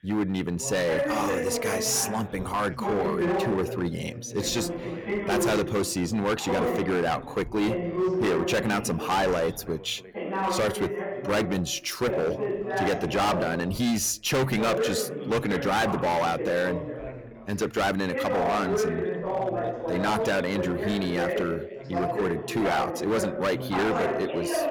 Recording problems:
distortion; heavy; 15% of the sound clipped
background chatter; loud; throughout; 3 voices, 3 dB below the speech

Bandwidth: 18 kHz